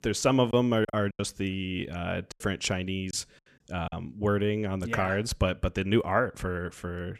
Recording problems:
choppy; very; at 0.5 s and from 2.5 to 4 s; 8% of the speech affected

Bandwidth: 13.5 kHz